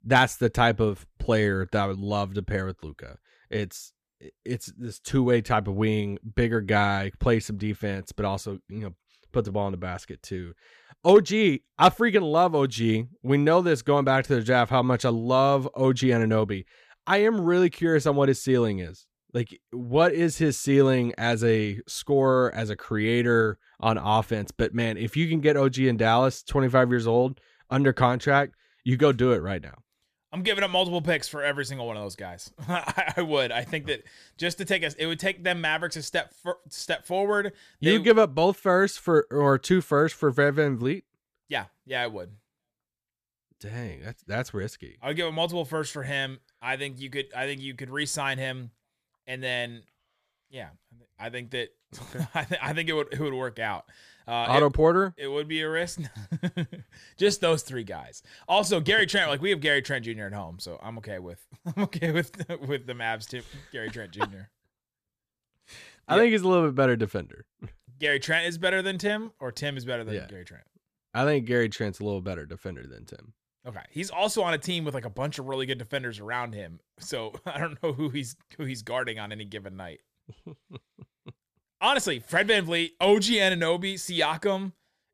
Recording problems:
none

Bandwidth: 14.5 kHz